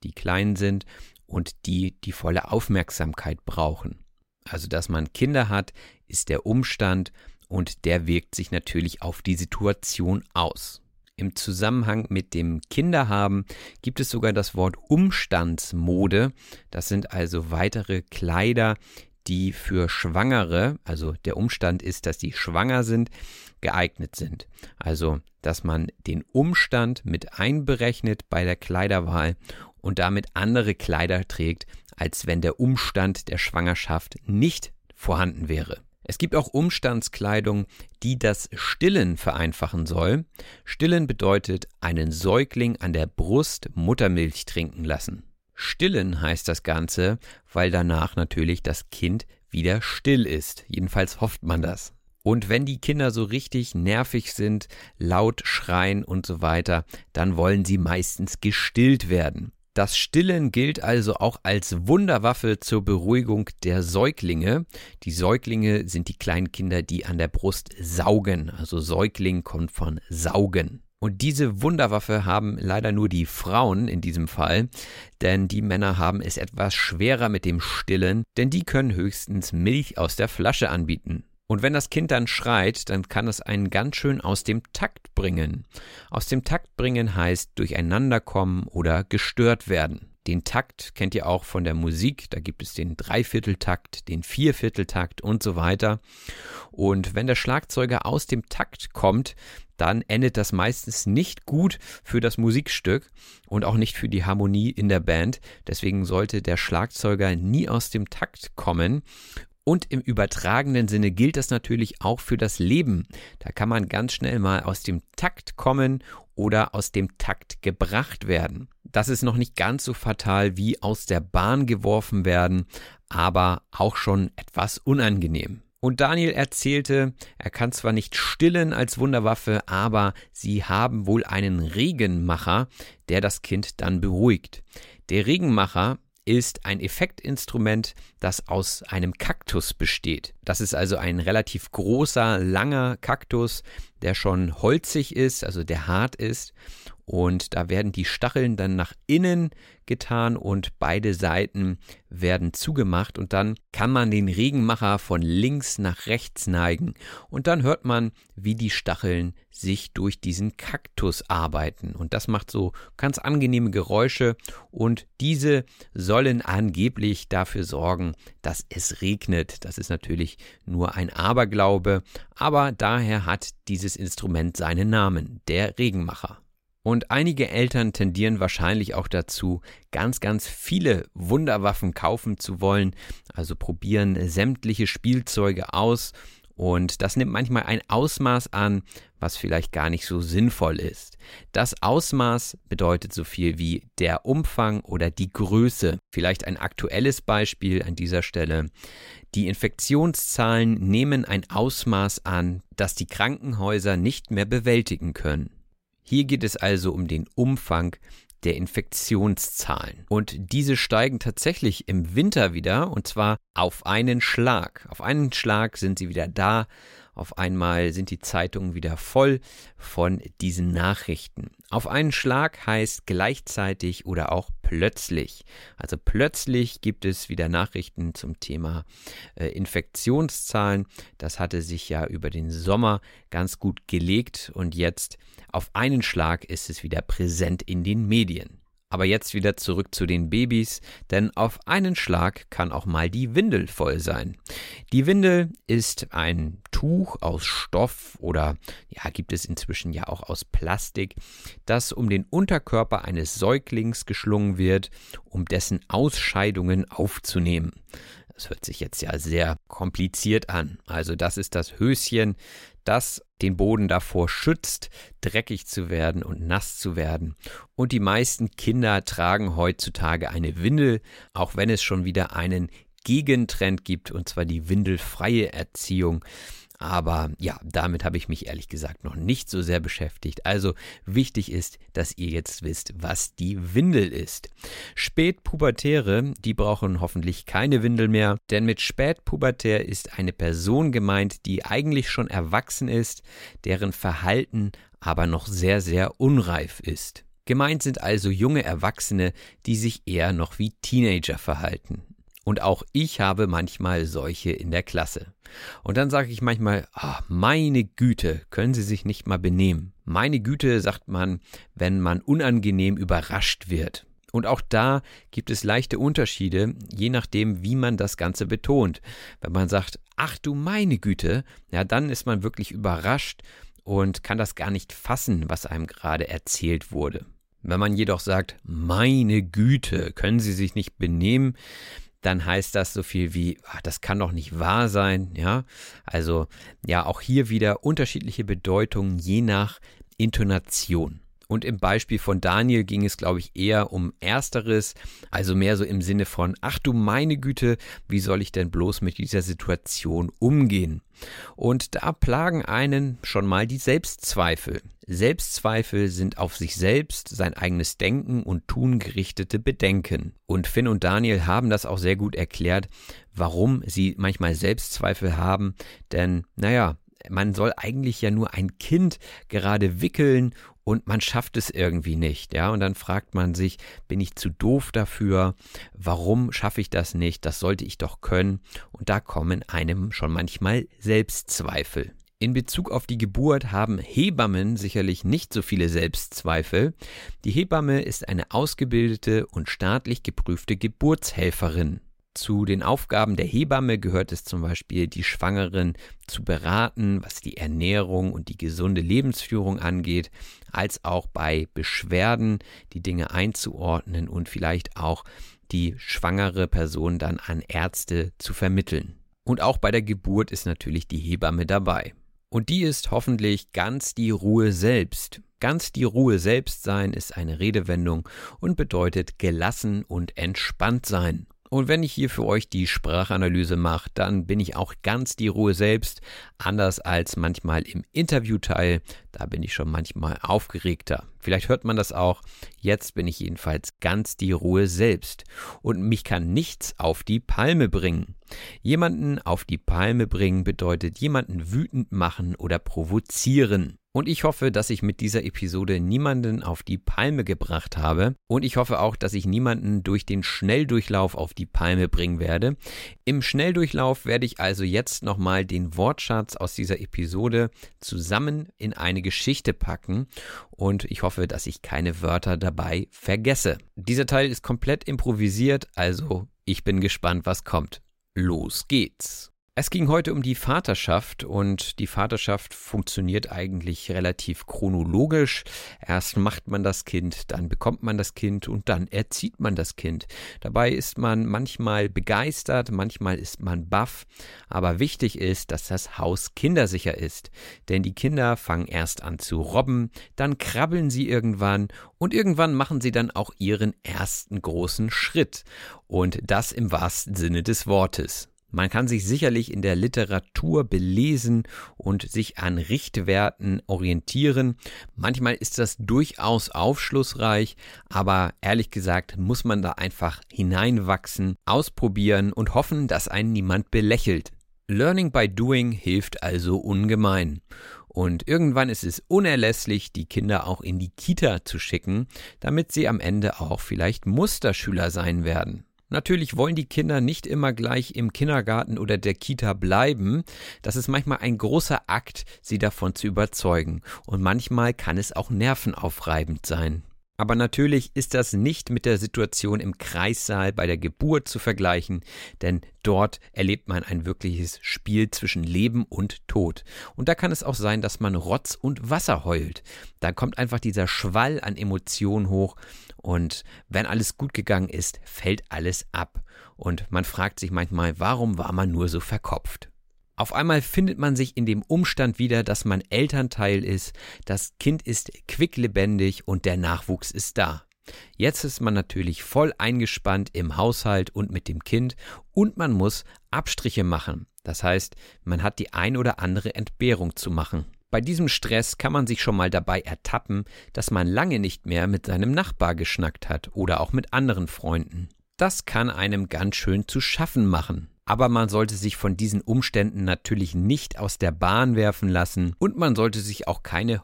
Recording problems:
none

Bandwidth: 16 kHz